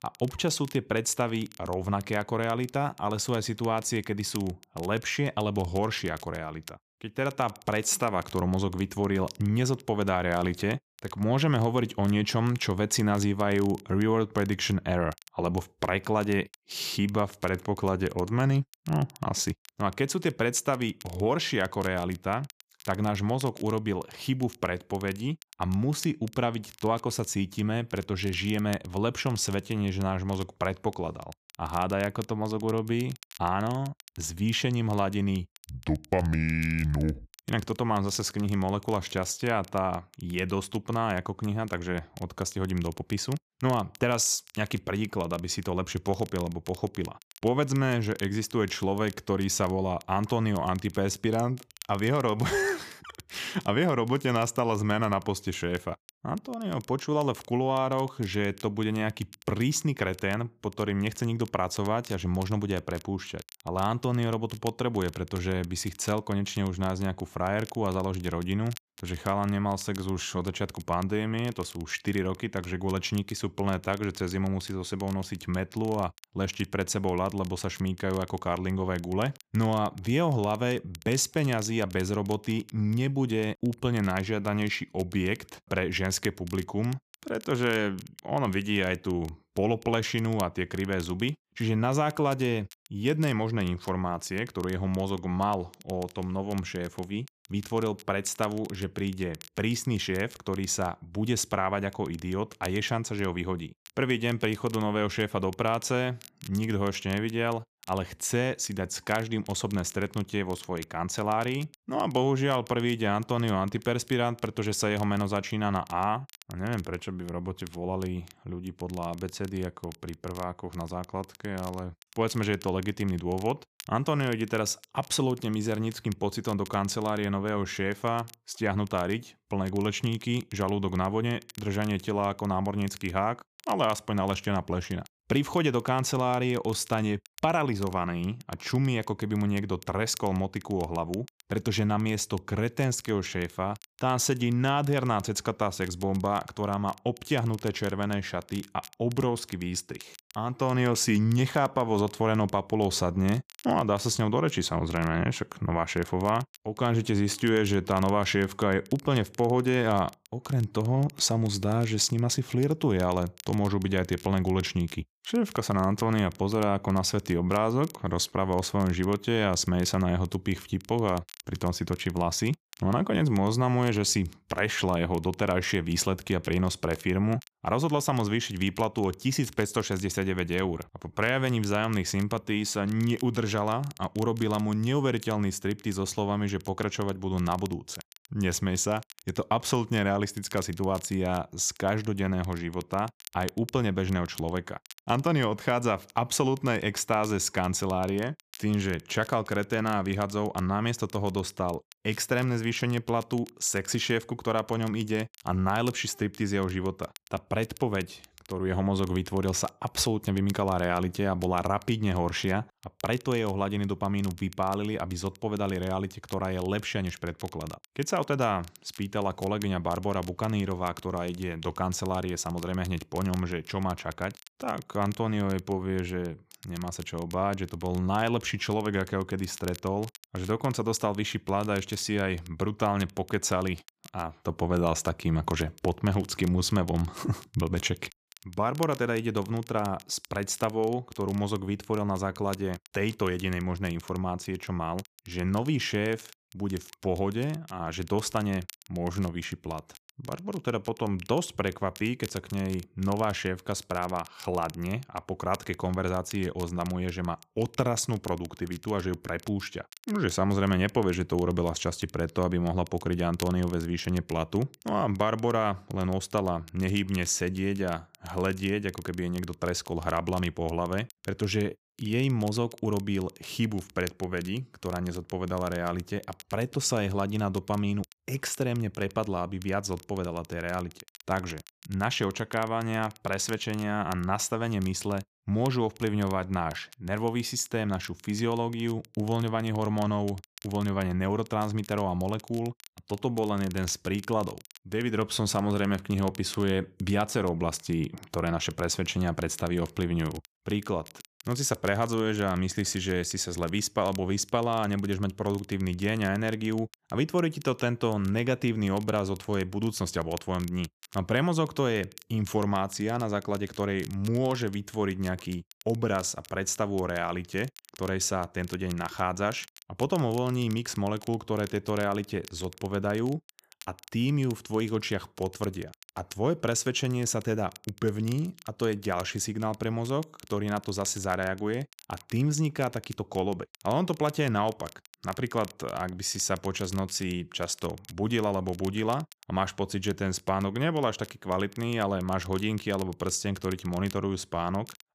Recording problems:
crackle, like an old record; faint; 20 dB below the speech

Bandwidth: 14.5 kHz